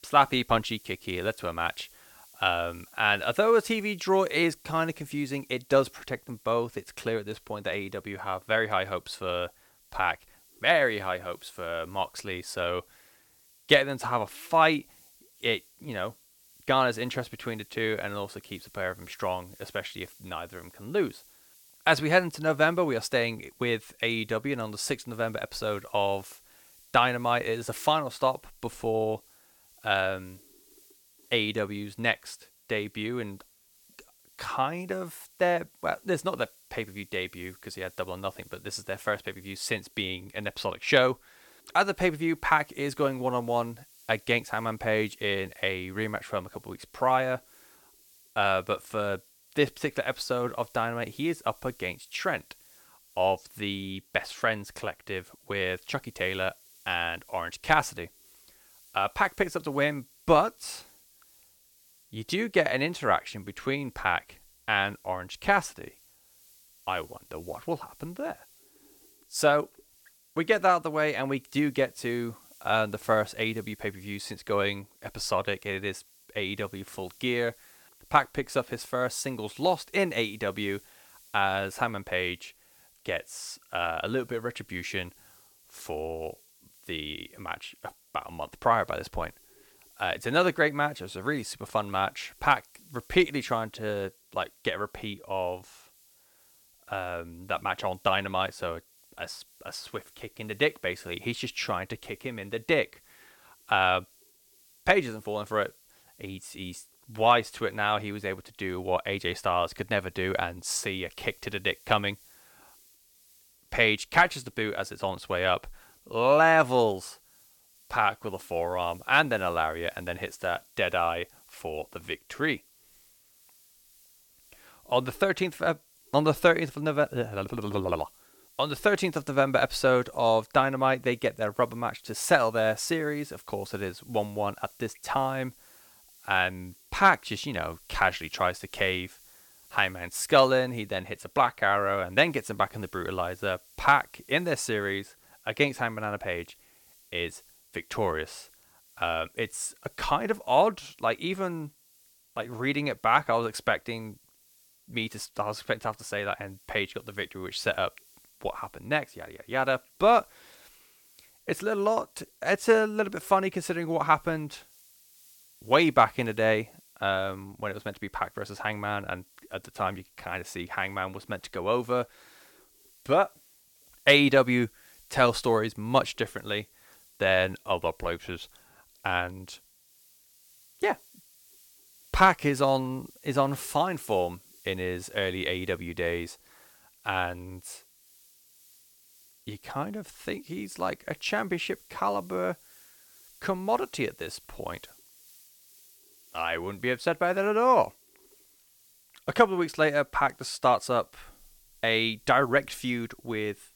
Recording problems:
hiss; faint; throughout; 25 dB below the speech

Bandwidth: 17 kHz